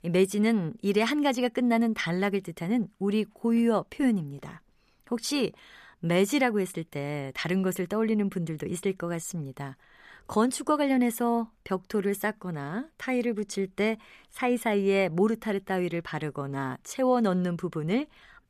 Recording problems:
none

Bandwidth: 14.5 kHz